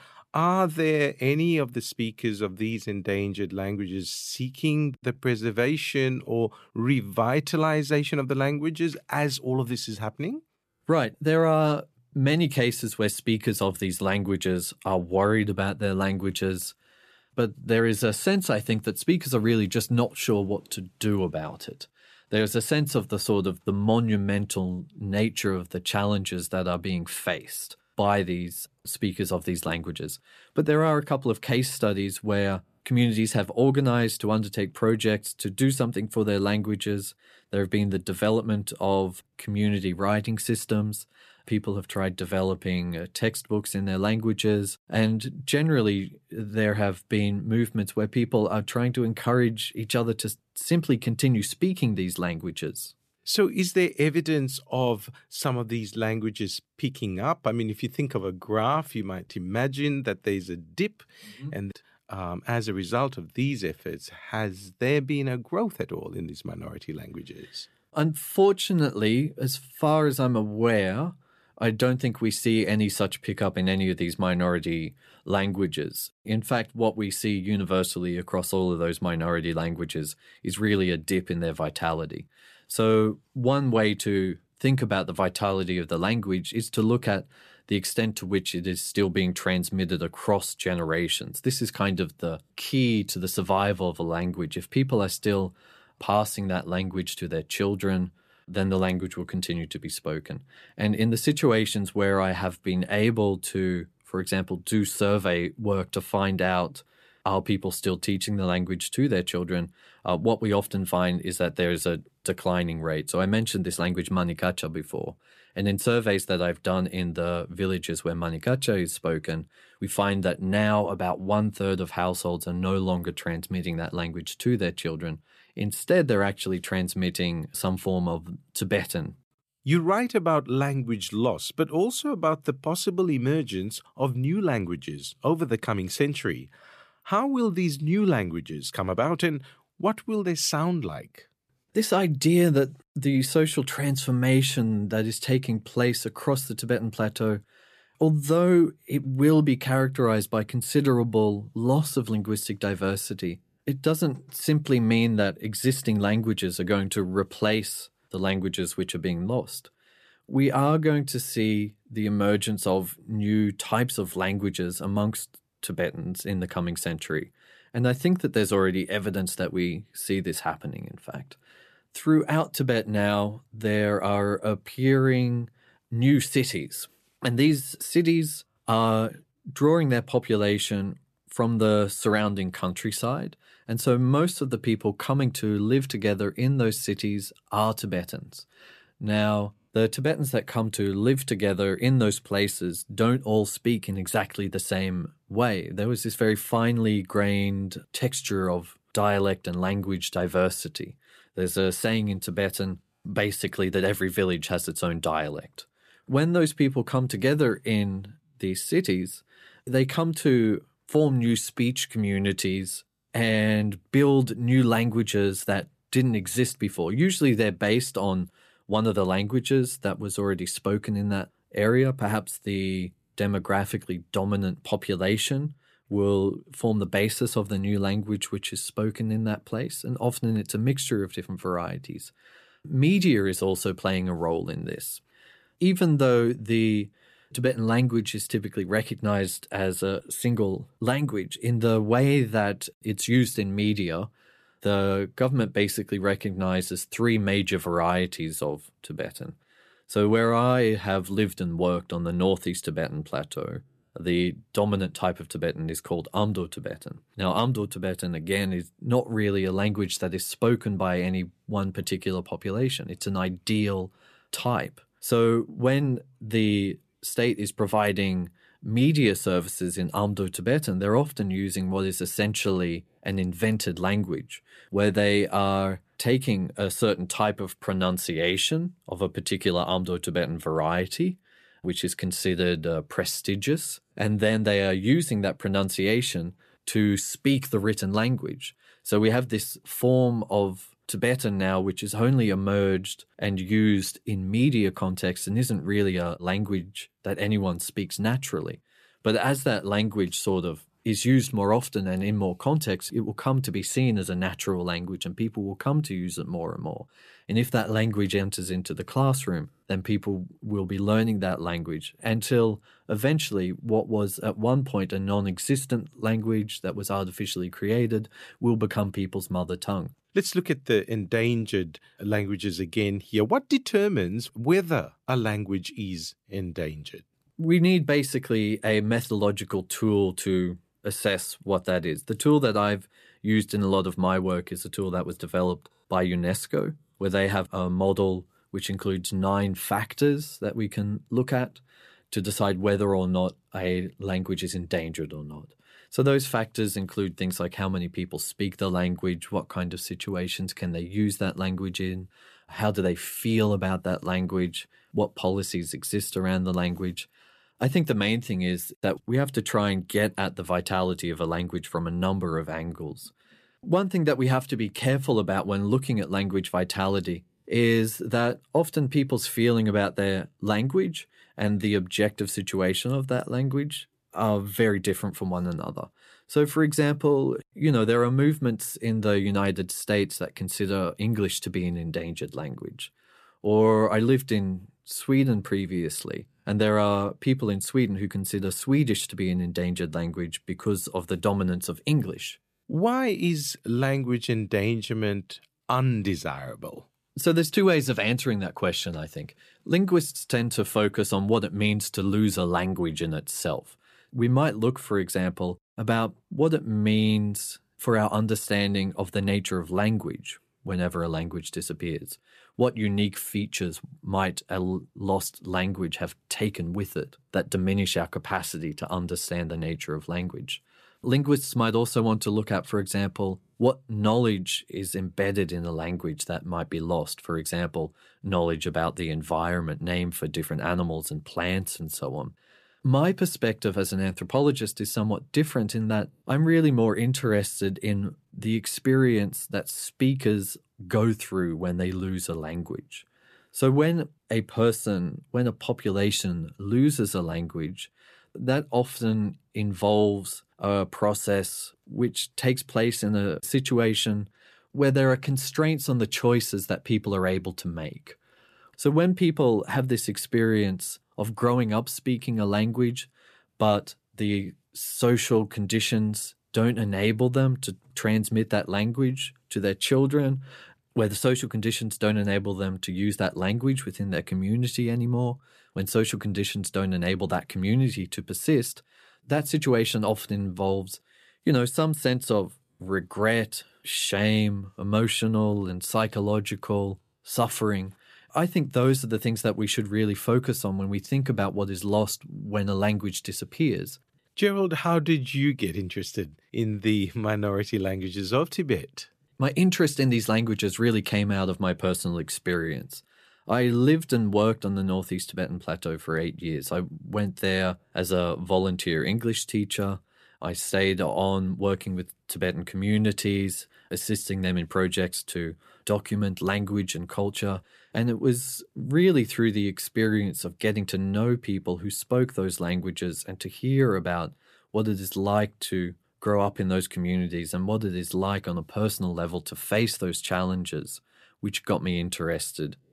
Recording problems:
none

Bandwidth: 14.5 kHz